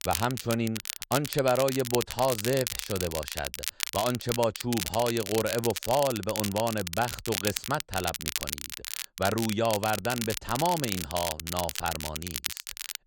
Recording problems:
crackle, like an old record; loud; 4 dB below the speech

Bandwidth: 16.5 kHz